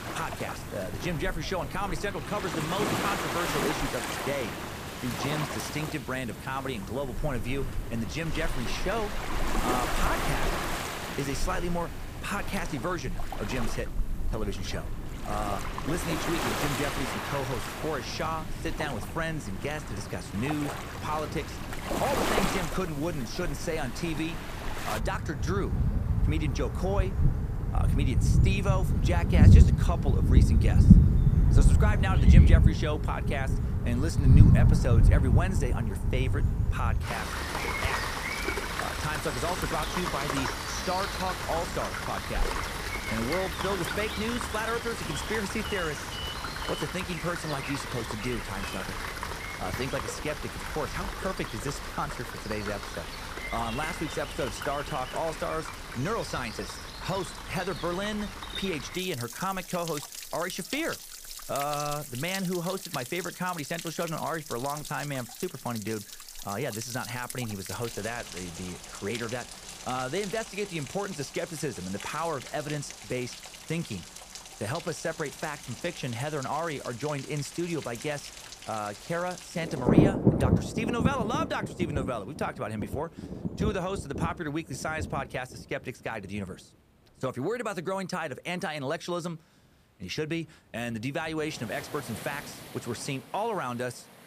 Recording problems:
rain or running water; very loud; throughout; 4 dB above the speech

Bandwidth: 15 kHz